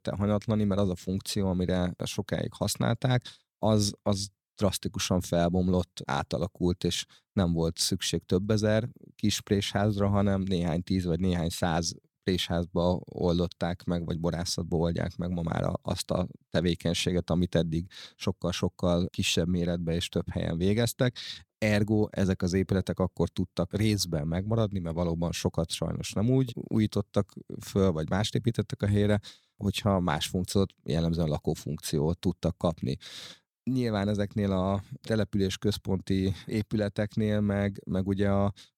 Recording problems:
none

